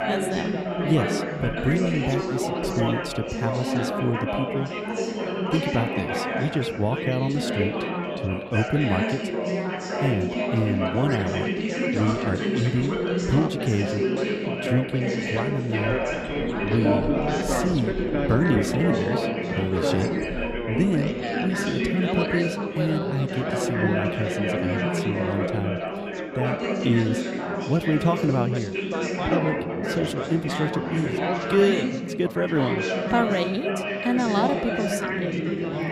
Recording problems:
chatter from many people; very loud; throughout; as loud as the speech

